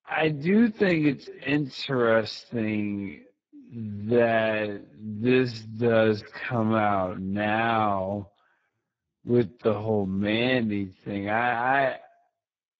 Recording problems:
garbled, watery; badly
wrong speed, natural pitch; too slow; 0.6 times normal speed

